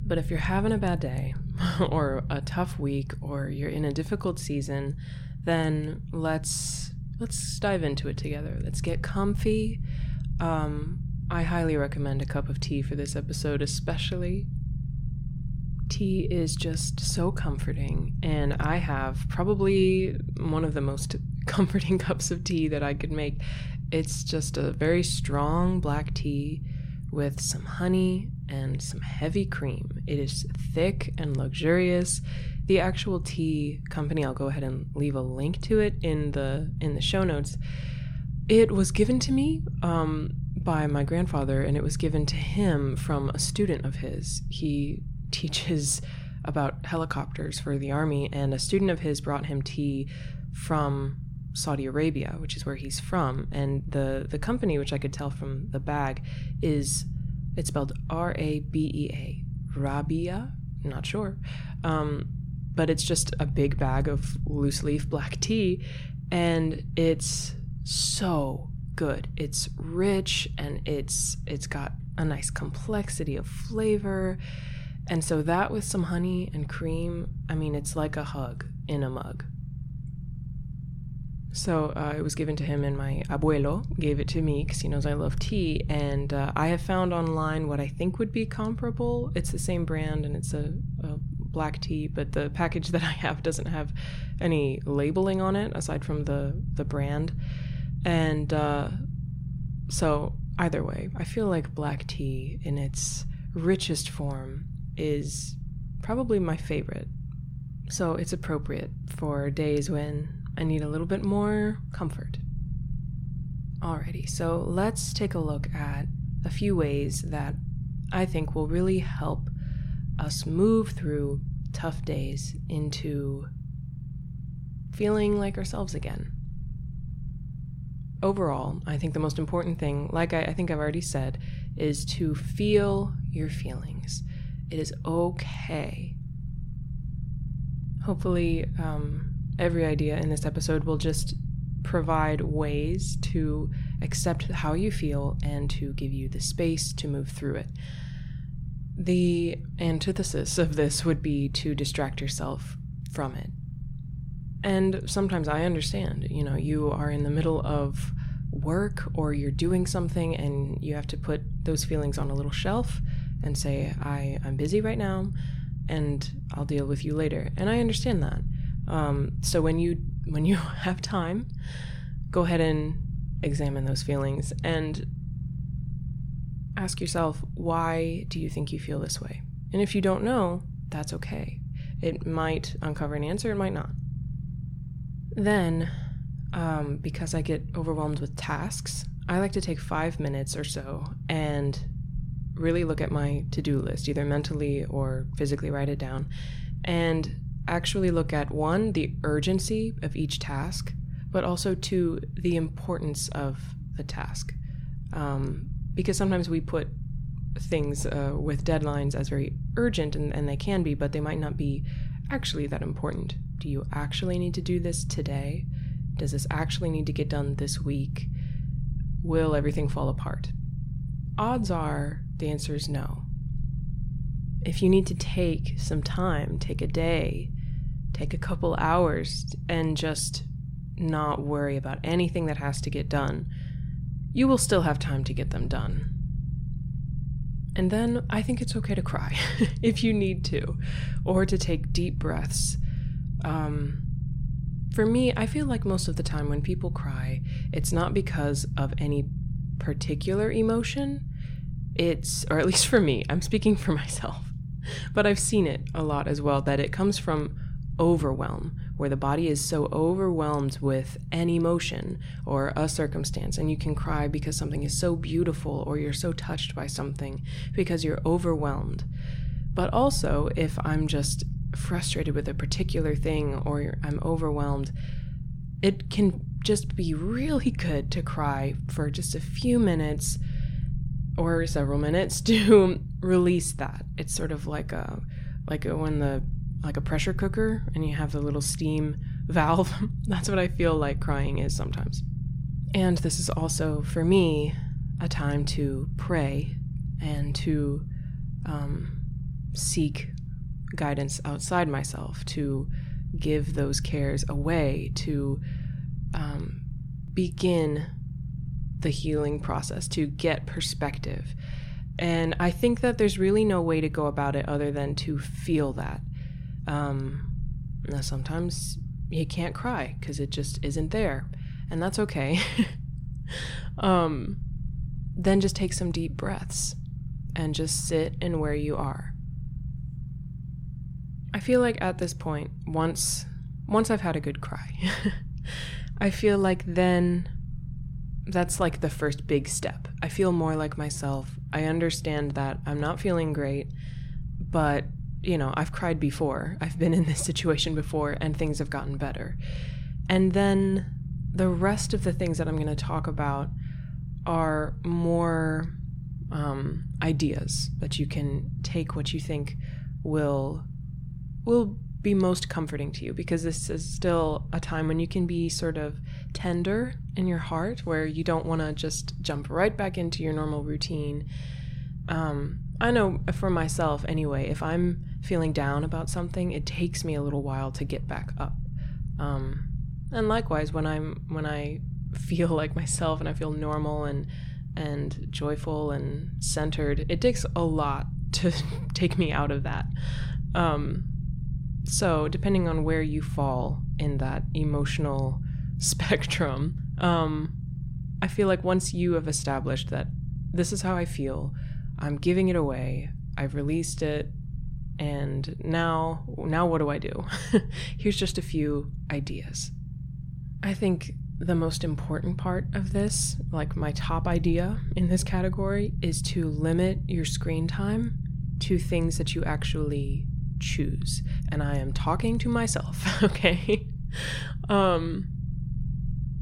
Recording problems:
low rumble; noticeable; throughout; 15 dB below the speech

